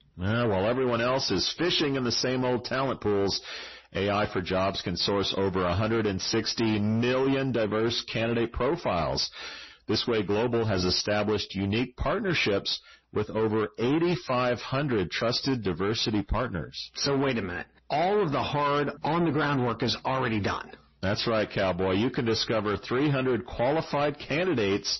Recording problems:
distortion; slight; 10 dB below the speech
garbled, watery; slightly; nothing above 6 kHz

